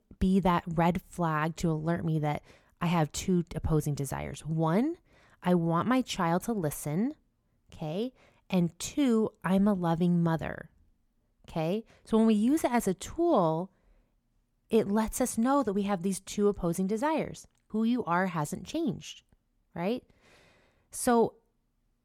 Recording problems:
none

